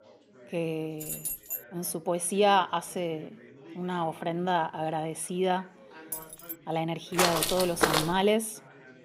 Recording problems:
background chatter; faint; throughout; 4 voices, 25 dB below the speech
jangling keys; noticeable; at 1 s and at 6 s; peak 3 dB below the speech
footsteps; loud; at 7 s; peak 4 dB above the speech

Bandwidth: 15.5 kHz